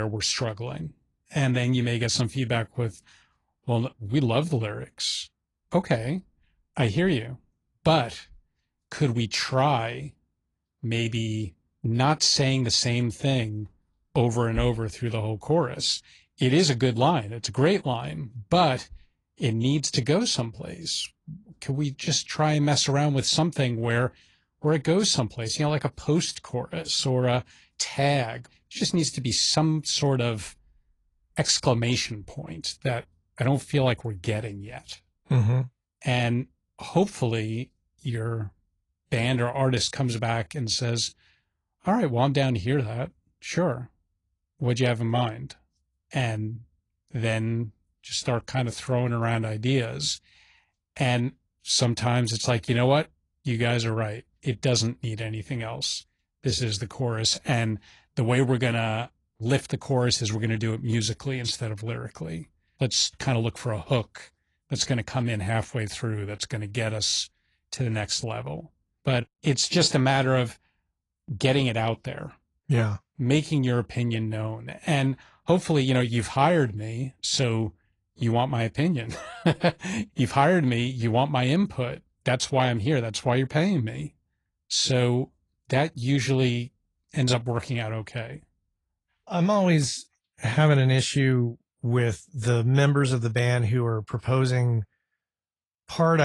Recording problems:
garbled, watery; slightly; nothing above 10 kHz
abrupt cut into speech; at the start and the end

